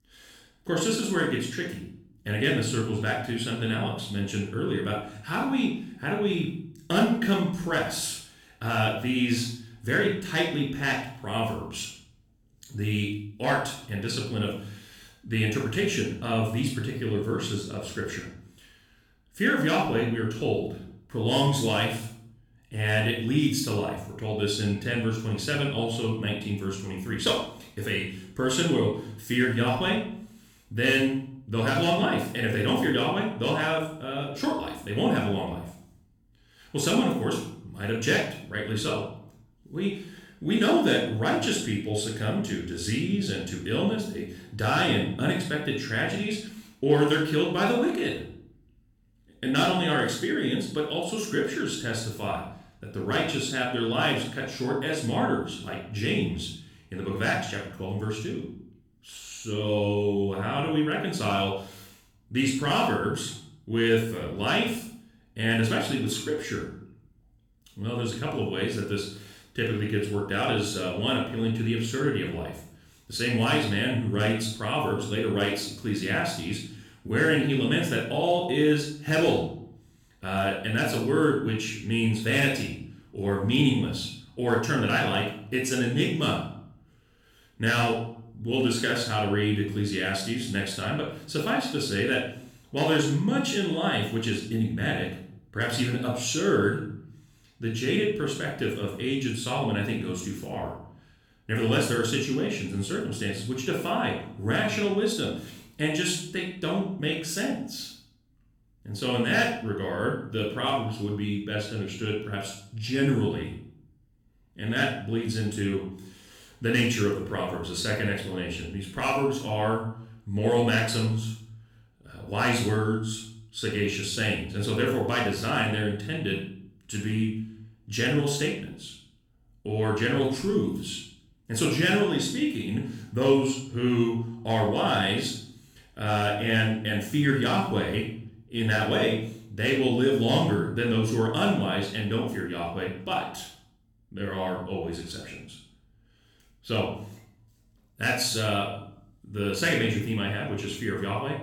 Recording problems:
room echo; noticeable; dies away in 0.5 s
off-mic speech; somewhat distant

